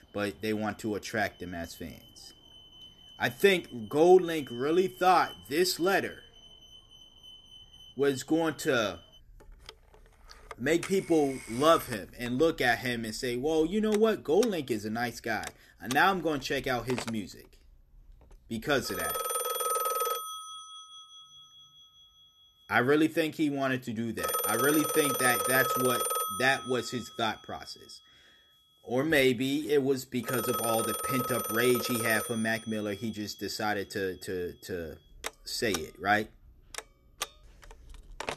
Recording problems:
alarms or sirens; loud; throughout; 5 dB below the speech

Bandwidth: 13.5 kHz